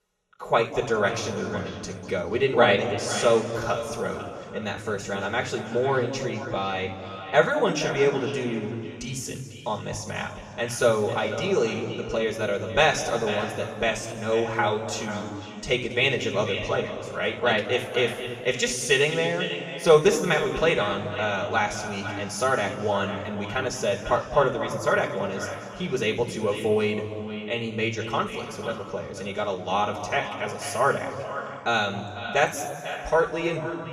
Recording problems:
echo of what is said; noticeable; throughout; 490 ms later, 10 dB below the speech
room echo; noticeable; dies away in 2.1 s
off-mic speech; somewhat distant

